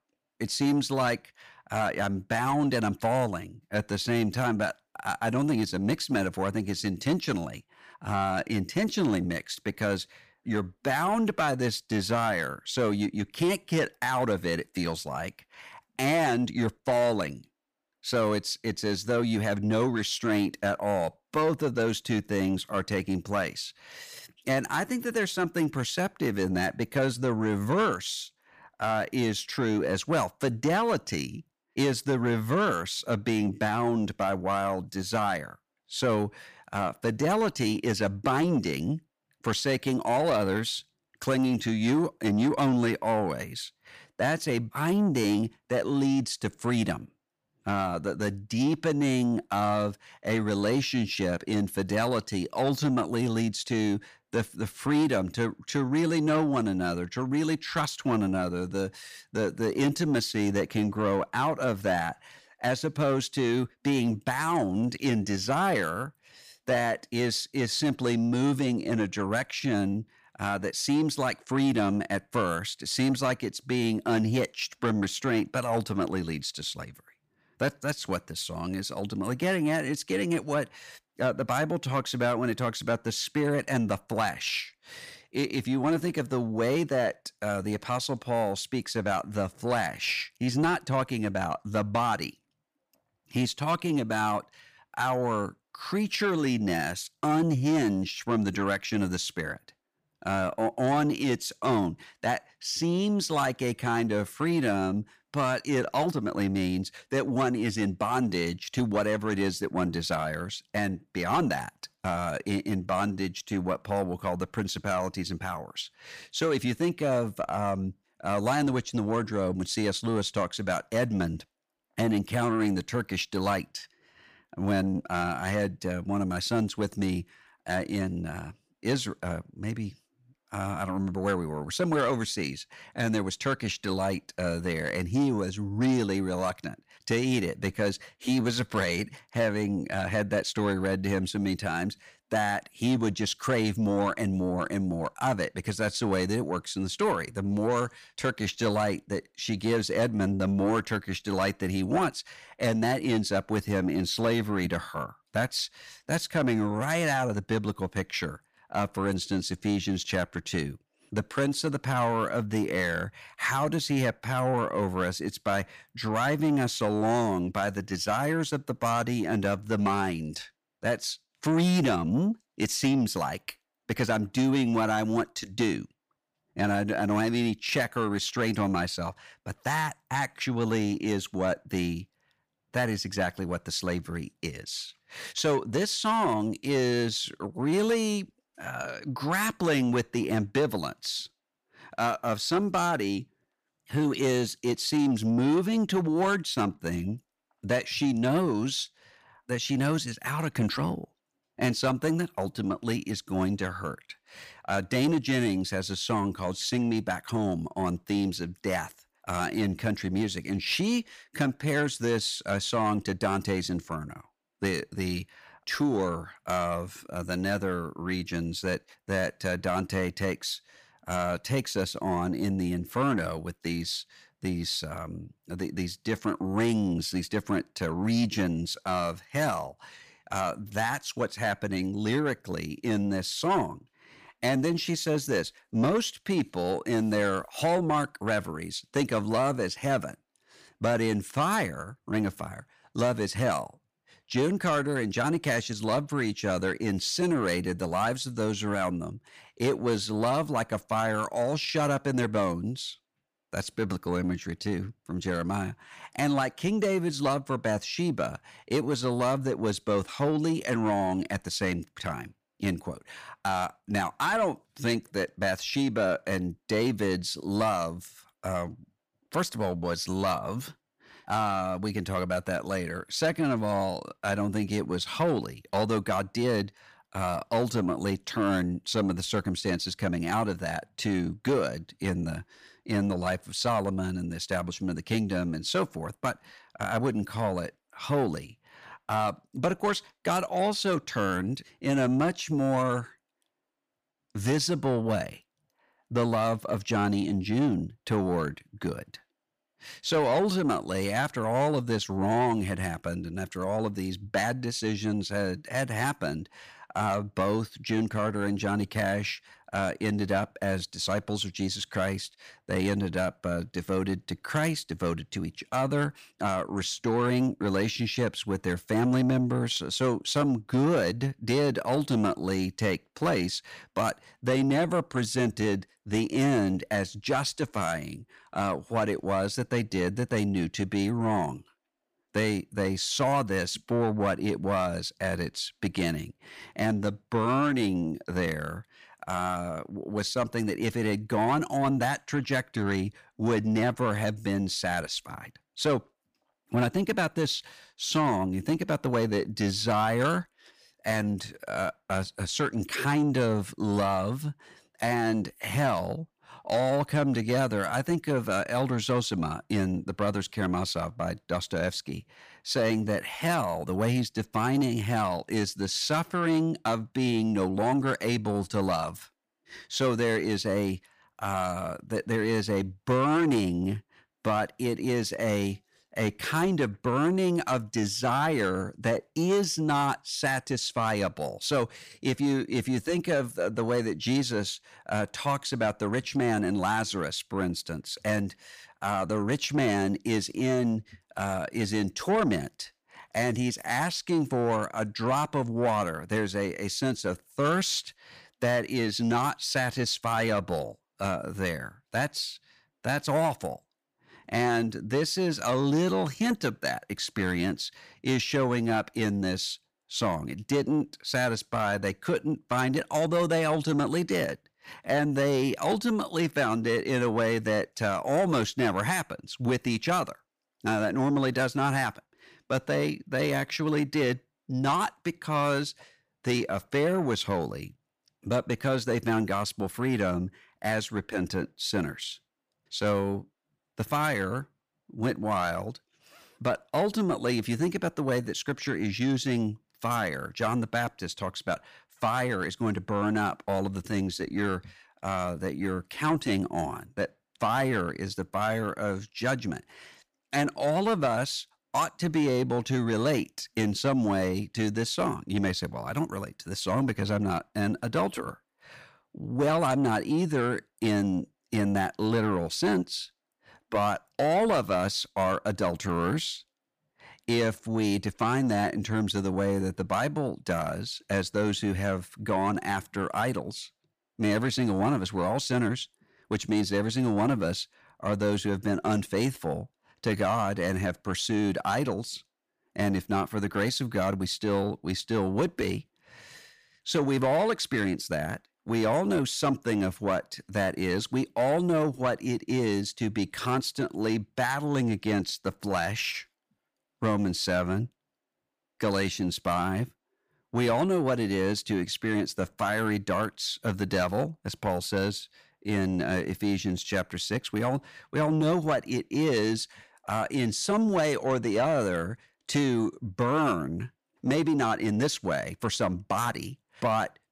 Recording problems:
distortion; slight; 10 dB below the speech

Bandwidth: 15 kHz